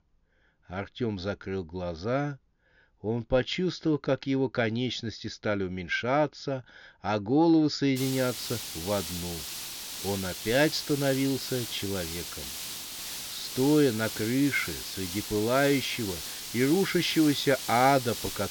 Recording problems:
high frequencies cut off; noticeable; nothing above 7 kHz
hiss; loud; from 8 s on; 7 dB below the speech

